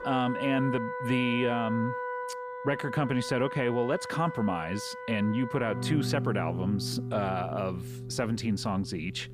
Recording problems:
background music; loud; throughout; 6 dB below the speech

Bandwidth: 14.5 kHz